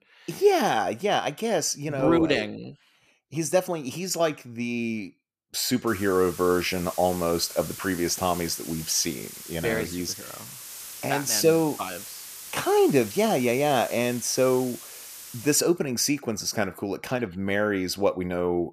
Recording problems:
hiss; noticeable; from 6 to 16 s; 15 dB below the speech

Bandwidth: 14.5 kHz